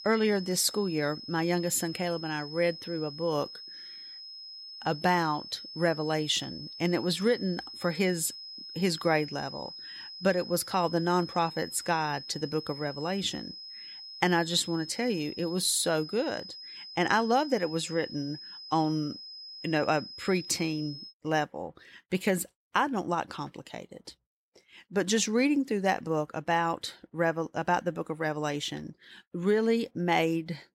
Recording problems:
high-pitched whine; noticeable; until 21 s; 5 kHz, 10 dB below the speech

